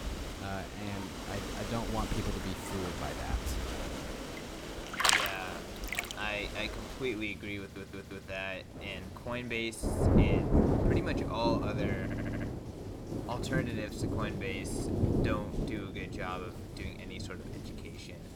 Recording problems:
rain or running water; very loud; throughout; 5 dB above the speech
audio stuttering; at 7.5 s and at 12 s

